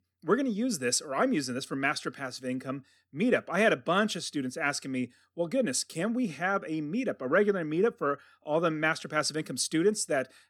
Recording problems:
none

